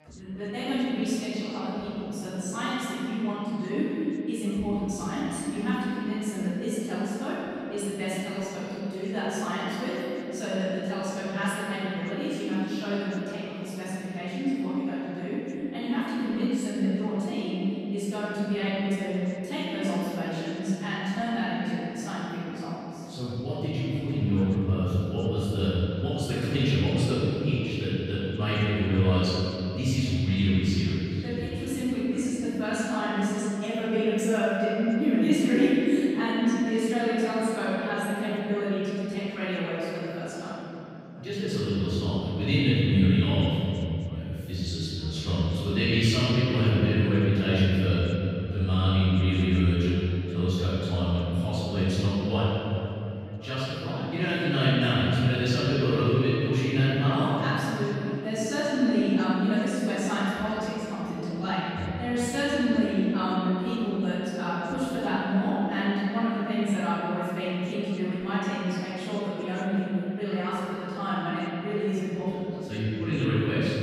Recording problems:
room echo; strong; dies away in 2.9 s
off-mic speech; far
background chatter; faint; throughout; 3 voices, 25 dB below the speech

